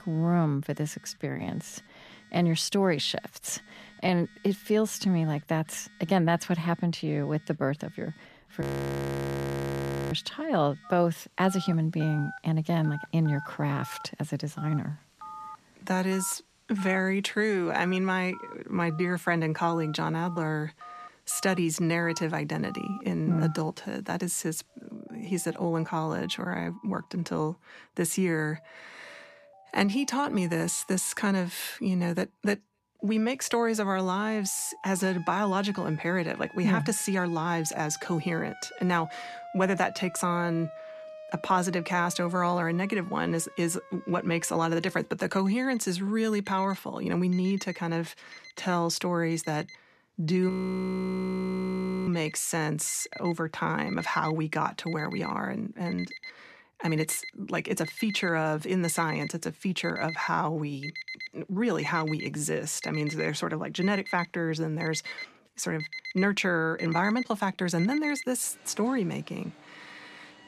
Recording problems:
alarms or sirens; noticeable; throughout; 15 dB below the speech
audio freezing; at 8.5 s for 1.5 s and at 50 s for 1.5 s

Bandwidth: 14 kHz